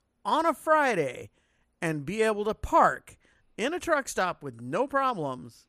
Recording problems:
none

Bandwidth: 15 kHz